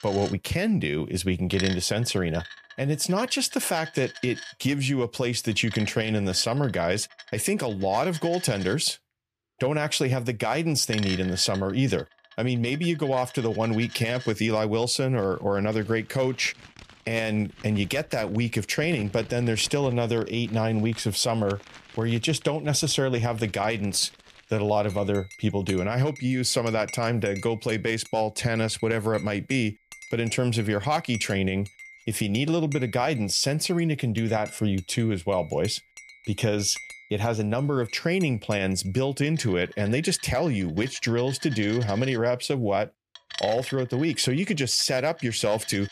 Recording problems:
household noises; noticeable; throughout; 15 dB below the speech

